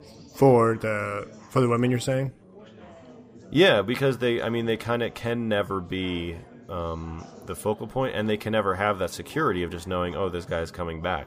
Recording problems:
chatter from many people; faint; throughout; 20 dB below the speech

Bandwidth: 15 kHz